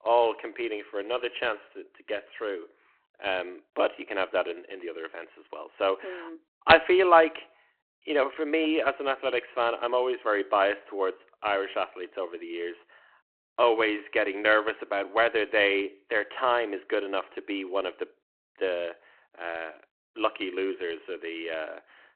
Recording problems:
phone-call audio; nothing above 4 kHz

